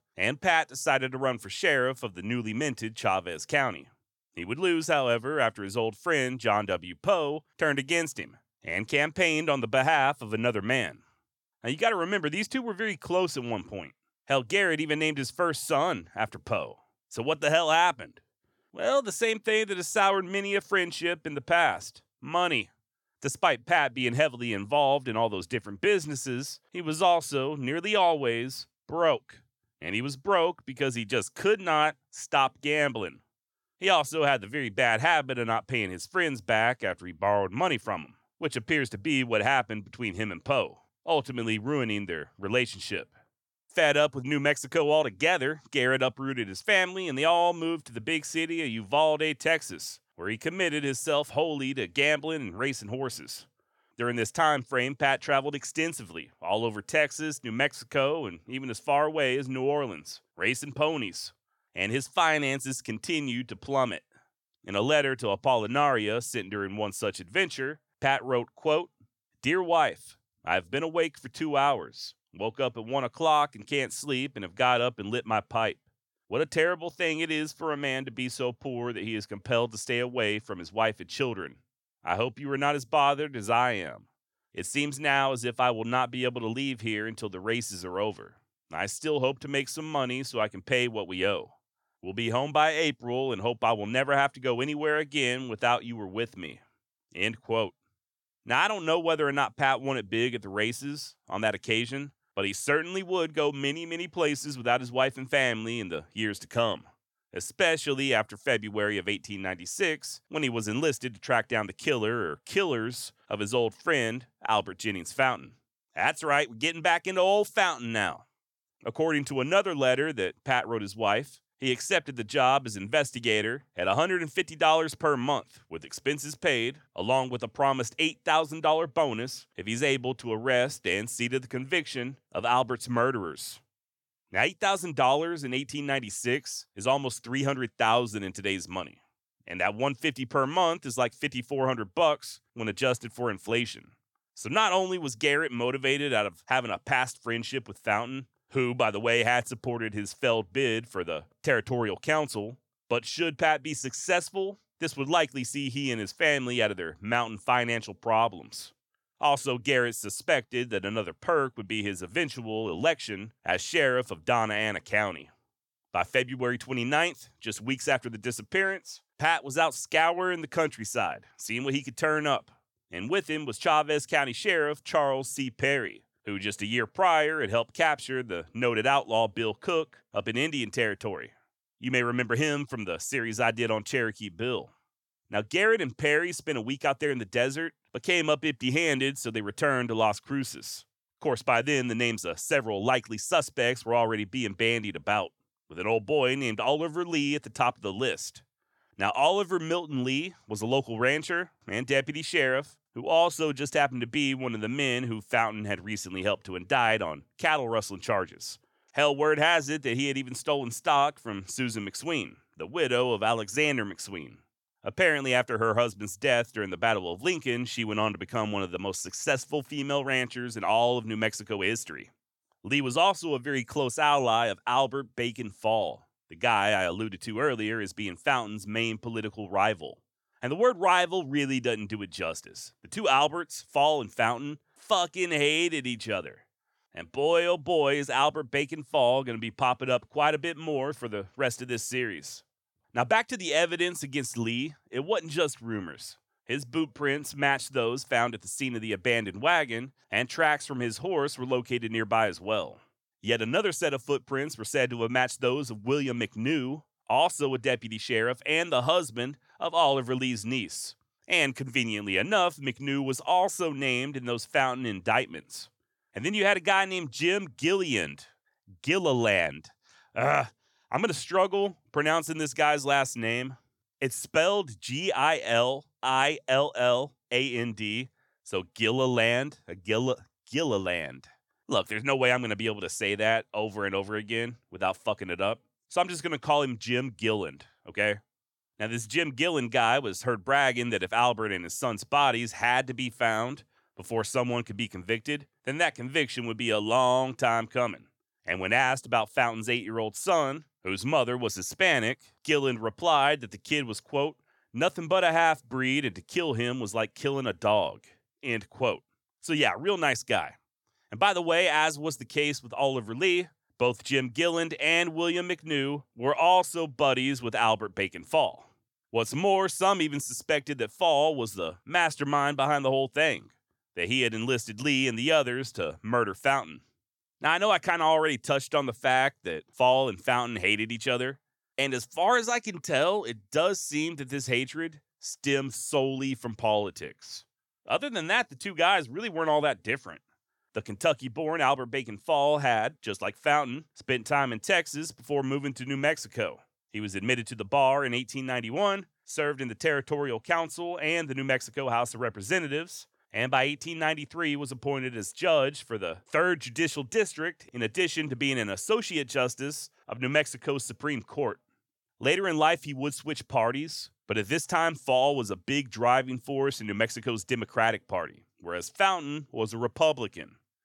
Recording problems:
none

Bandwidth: 17 kHz